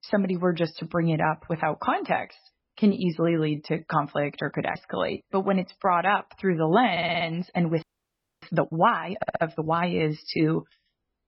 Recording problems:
garbled, watery; badly; nothing above 5.5 kHz
audio stuttering; at 7 s and at 9 s
audio freezing; at 8 s for 0.5 s

